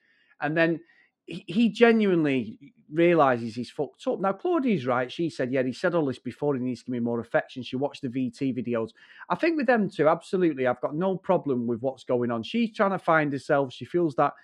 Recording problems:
muffled; slightly; fading above 3.5 kHz

